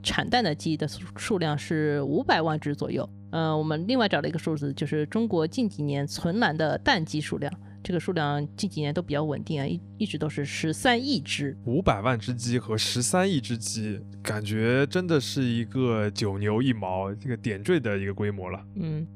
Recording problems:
electrical hum; faint; throughout; 50 Hz, 25 dB below the speech

